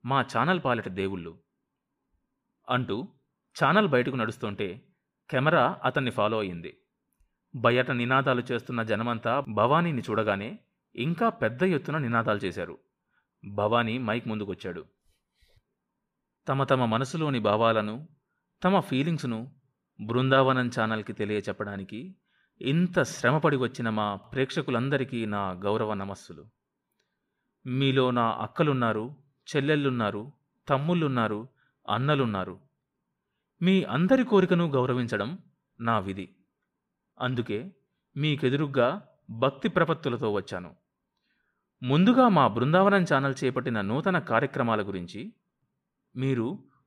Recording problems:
none

